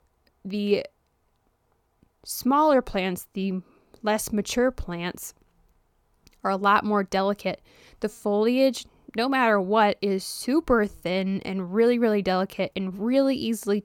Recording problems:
none

